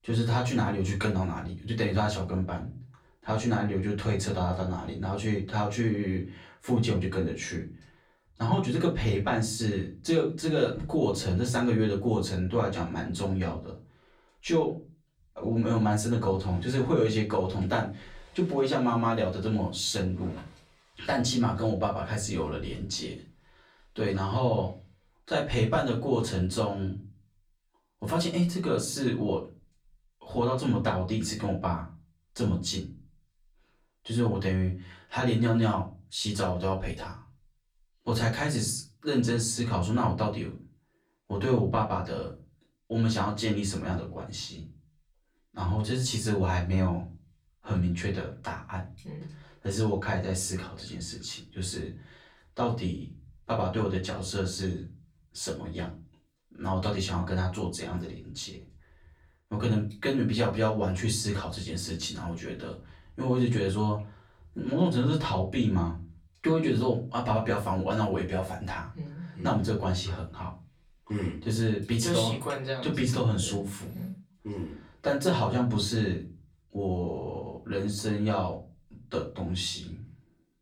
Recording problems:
off-mic speech; far
room echo; very slight; dies away in 0.3 s

